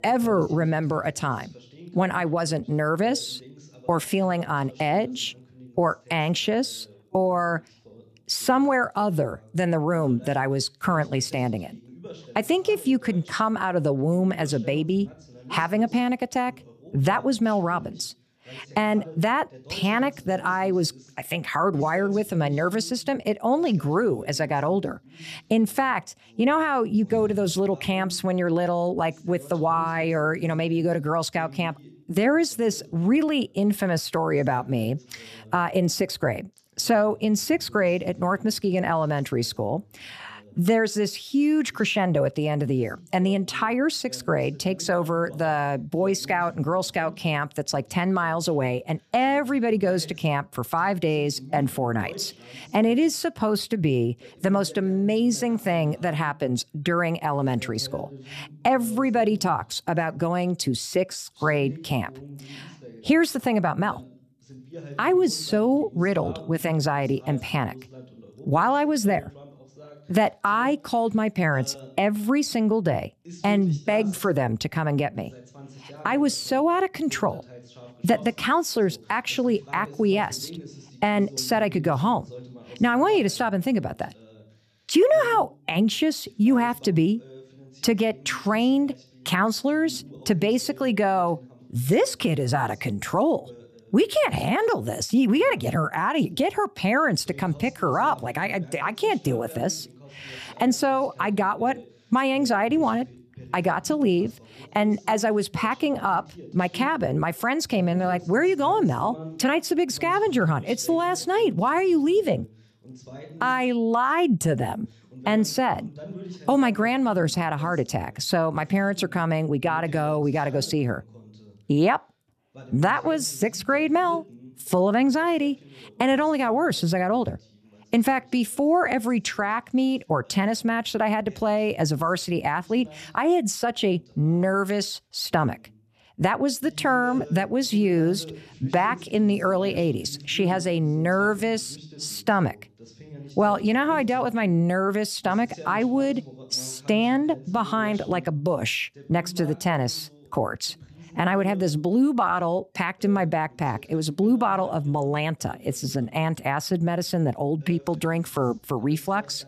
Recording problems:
voice in the background; faint; throughout; 20 dB below the speech

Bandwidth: 14.5 kHz